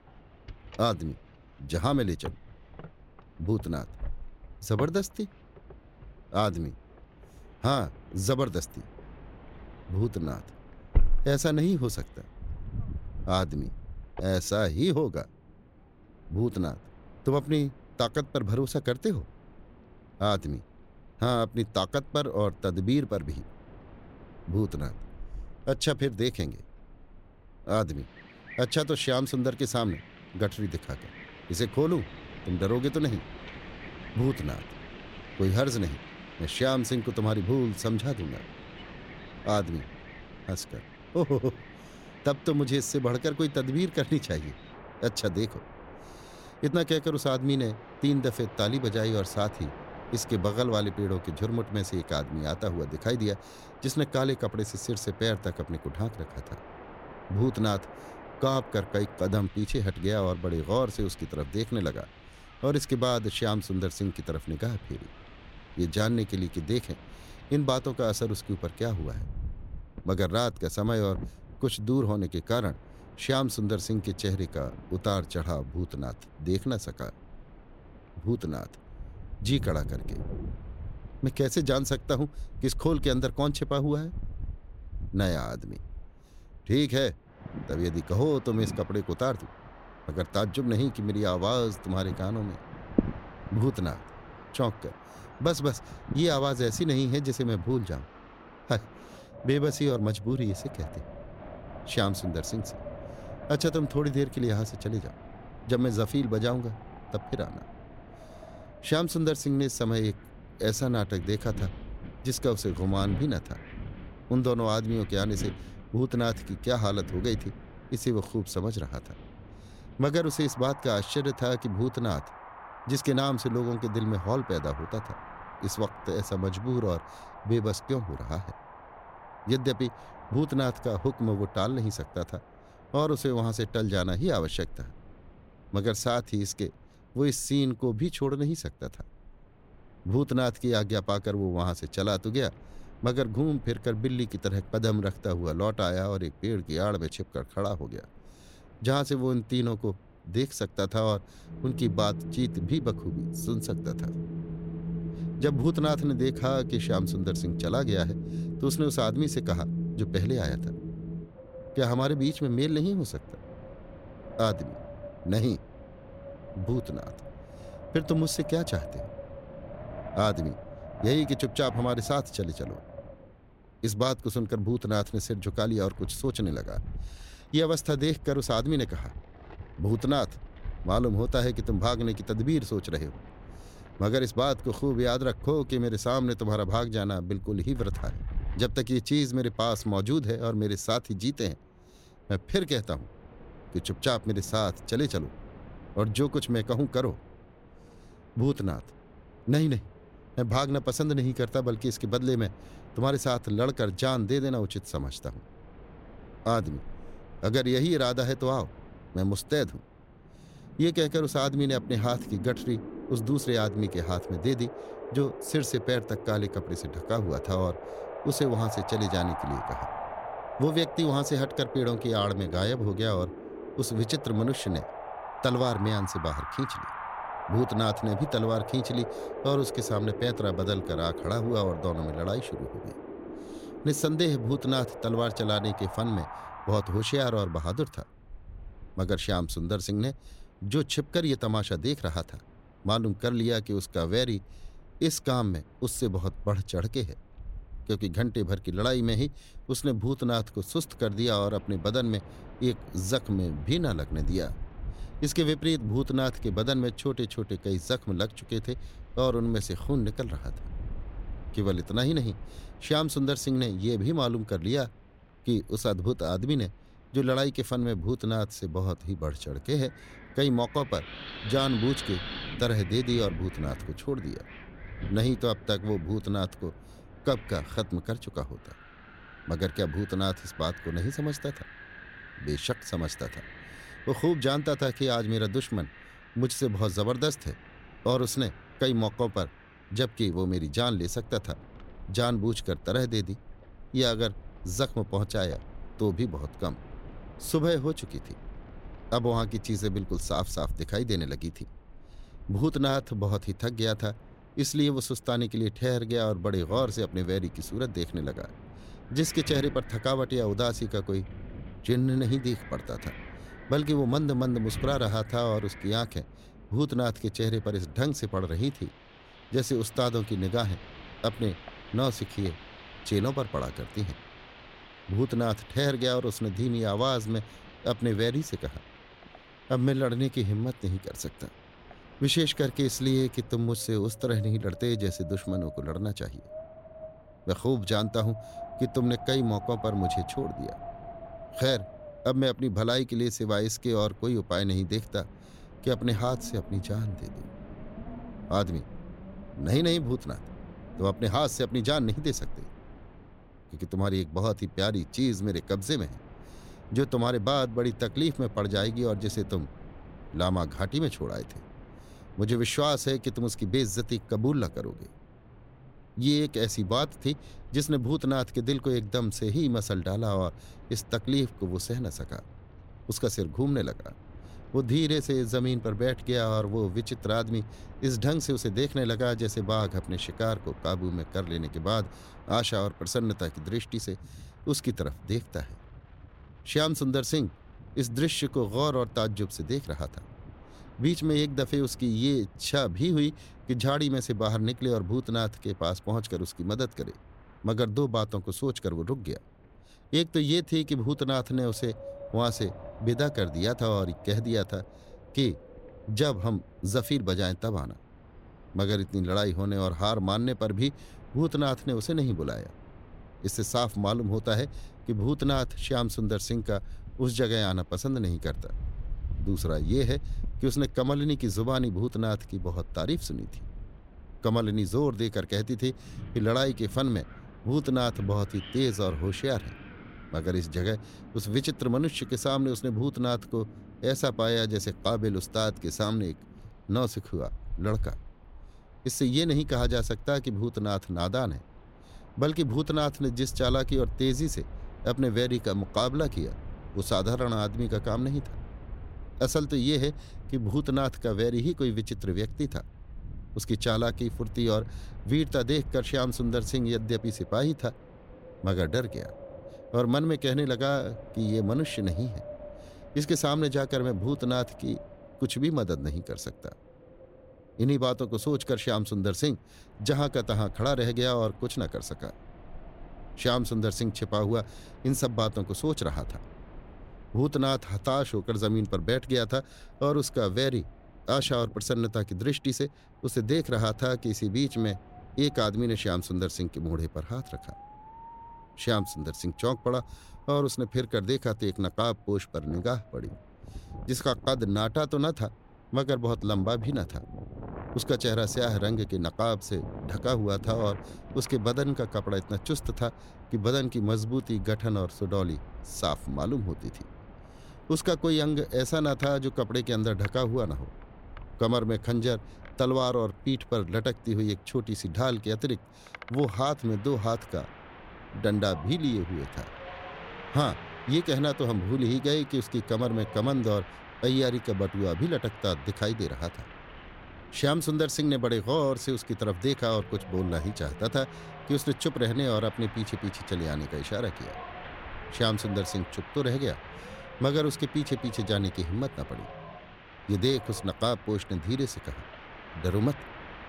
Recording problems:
wind in the background; noticeable; throughout; 15 dB below the speech

